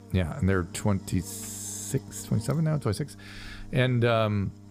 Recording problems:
electrical hum; noticeable; throughout; 50 Hz, 20 dB below the speech

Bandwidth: 15 kHz